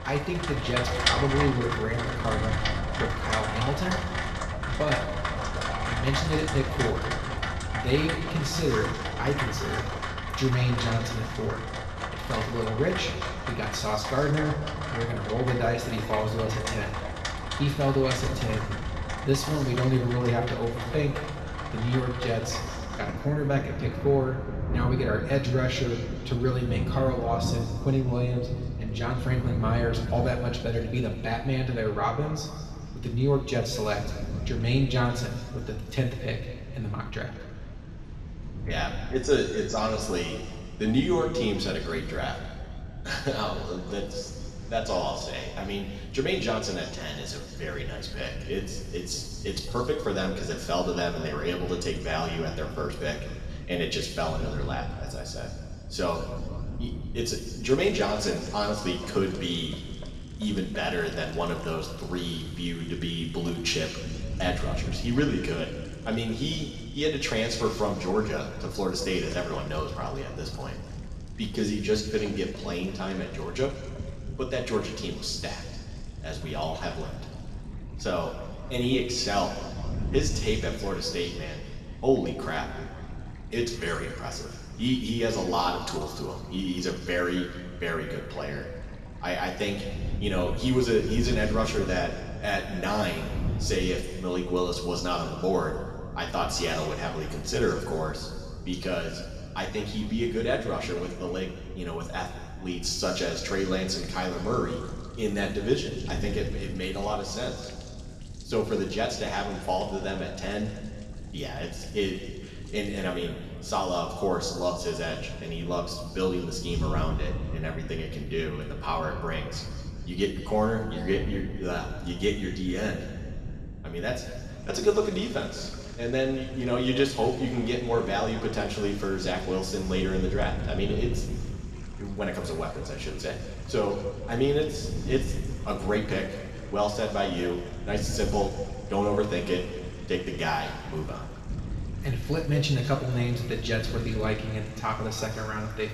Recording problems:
off-mic speech; far
room echo; noticeable; dies away in 1.9 s
rain or running water; loud; throughout; 5 dB below the speech
wind noise on the microphone; occasional gusts; 20 dB below the speech

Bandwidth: 13.5 kHz